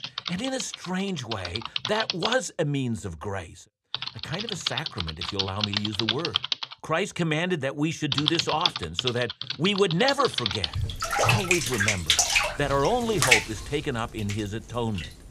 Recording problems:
household noises; very loud; throughout; 2 dB above the speech

